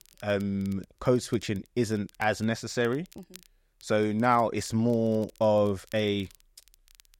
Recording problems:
crackle, like an old record; faint; 30 dB below the speech

